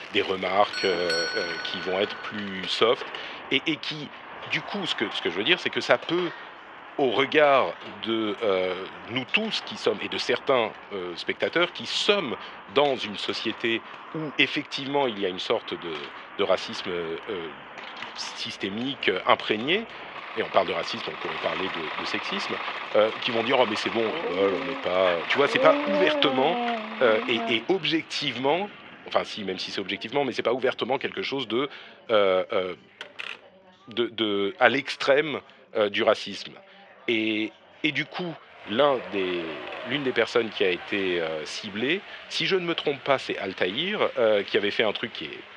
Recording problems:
thin; very; fading below 550 Hz
muffled; slightly; fading above 2 kHz
household noises; noticeable; throughout; 20 dB below the speech
traffic noise; noticeable; throughout; 10 dB below the speech
background chatter; faint; throughout; 2 voices, 30 dB below the speech
doorbell; noticeable; until 2.5 s; peak 1 dB below the speech
dog barking; loud; from 24 to 28 s; peak 1 dB above the speech
door banging; noticeable; at 33 s; peak 10 dB below the speech

